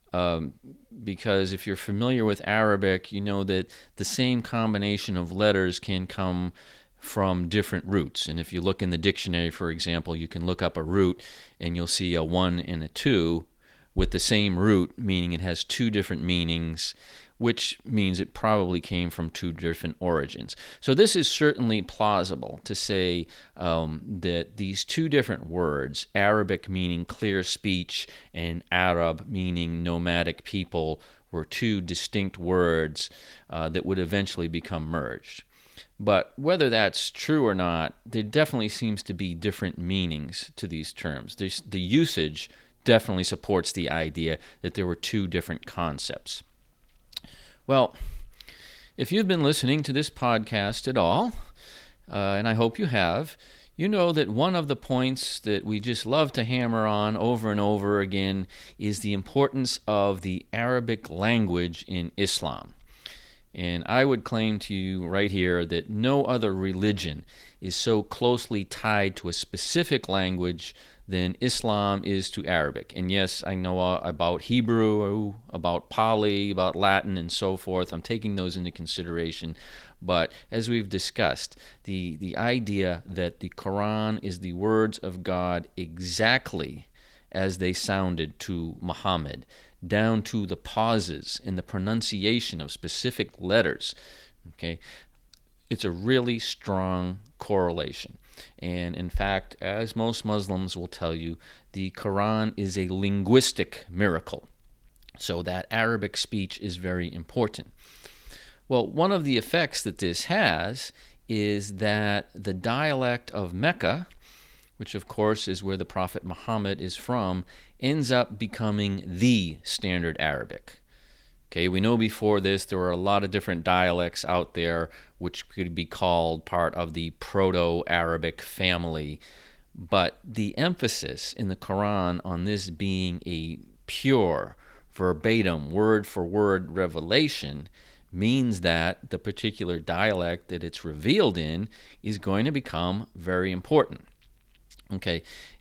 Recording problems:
garbled, watery; slightly; nothing above 18.5 kHz

